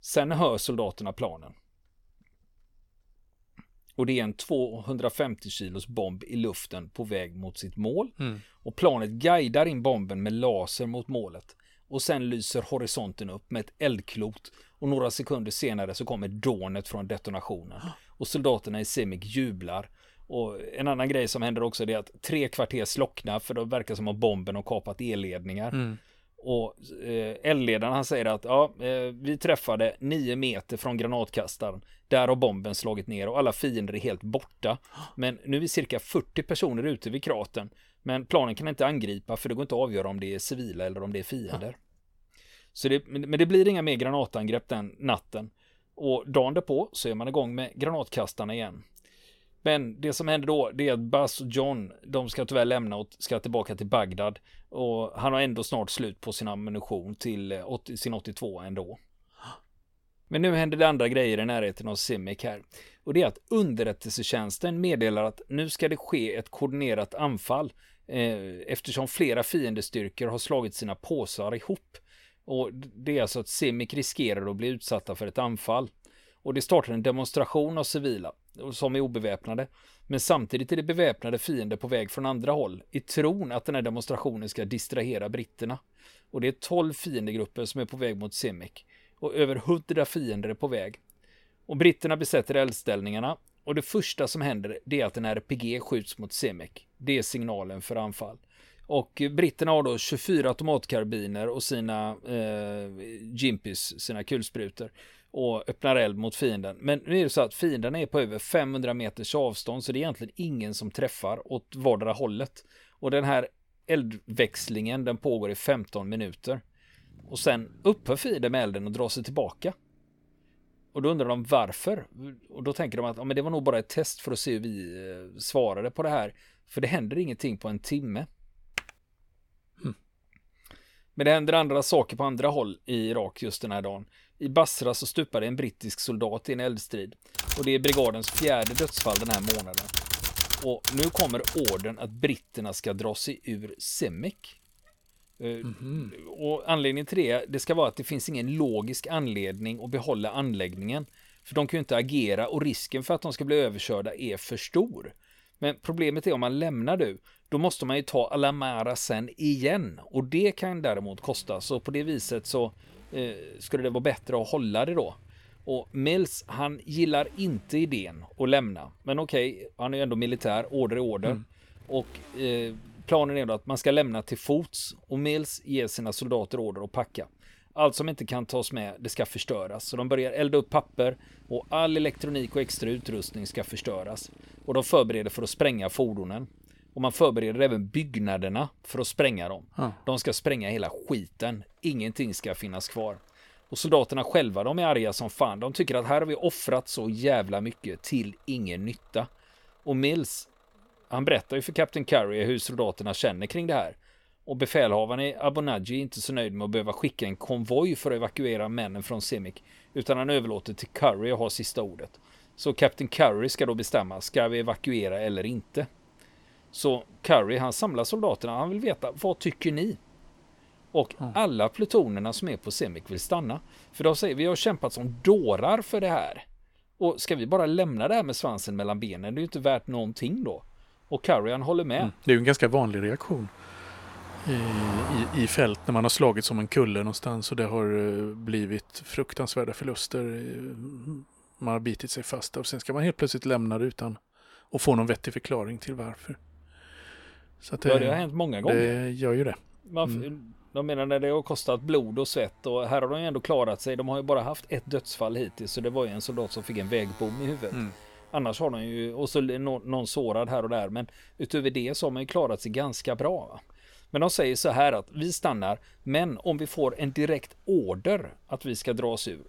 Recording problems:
traffic noise; faint; throughout; 25 dB below the speech
keyboard typing; very faint; at 2:09; peak 8 dB below the speech
keyboard typing; loud; from 2:17 to 2:22; peak 3 dB above the speech

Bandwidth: 18 kHz